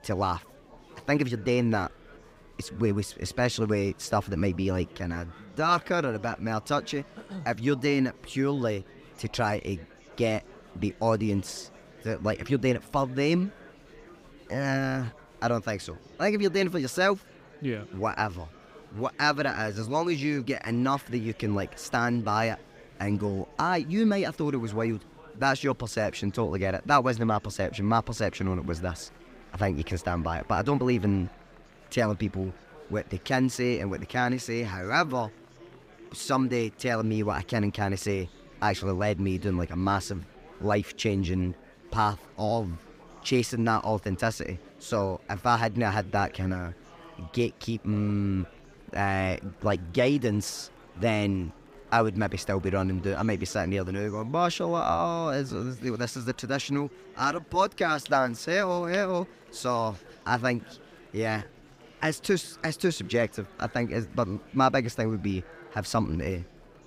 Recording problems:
murmuring crowd; faint; throughout; 25 dB below the speech

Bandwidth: 15.5 kHz